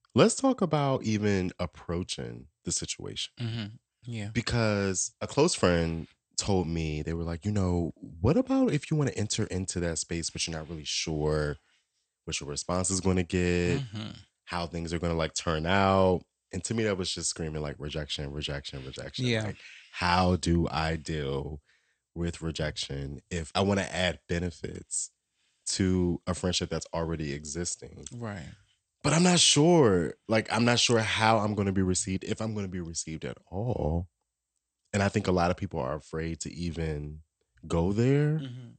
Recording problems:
garbled, watery; slightly; nothing above 8.5 kHz

